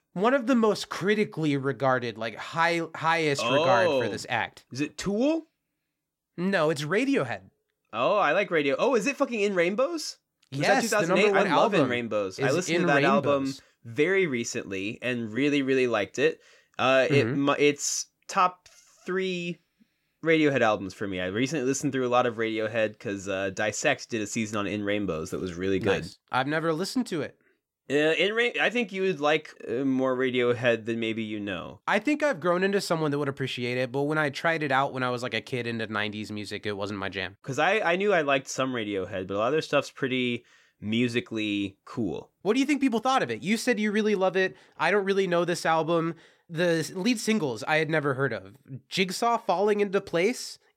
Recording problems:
none

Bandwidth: 16.5 kHz